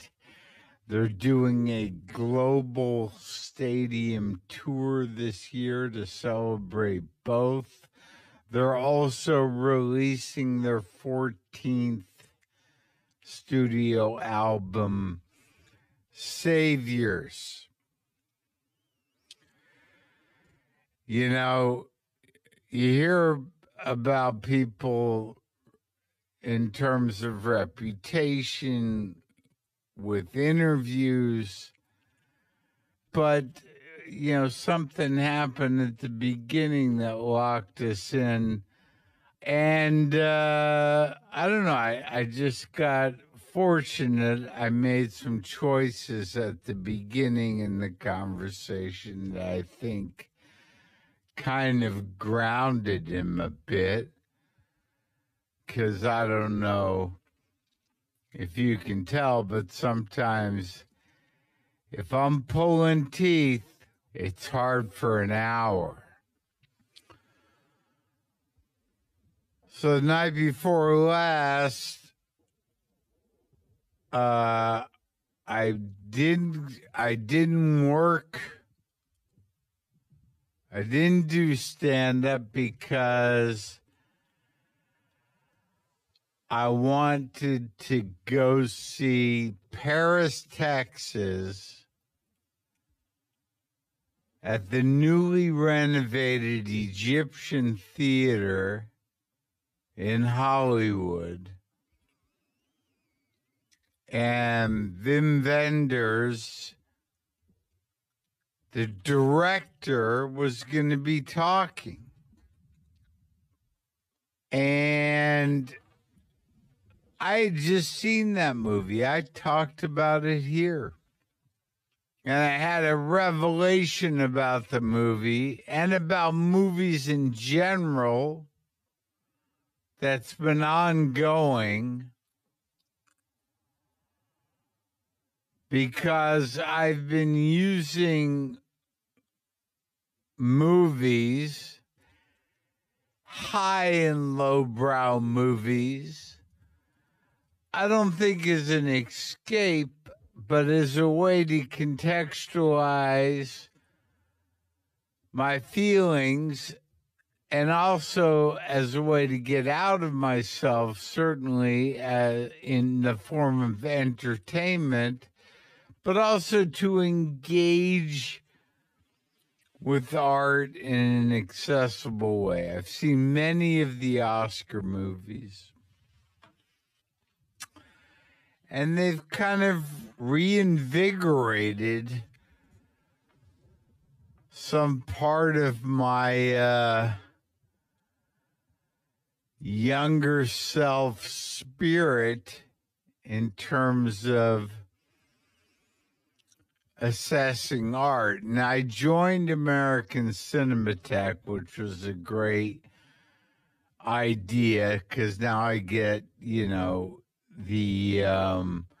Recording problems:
wrong speed, natural pitch; too slow; 0.5 times normal speed

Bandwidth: 14.5 kHz